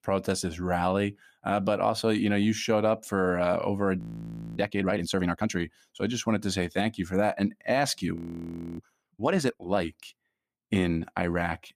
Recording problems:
audio freezing; at 4 s for 0.5 s and at 8 s for 0.5 s

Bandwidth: 15 kHz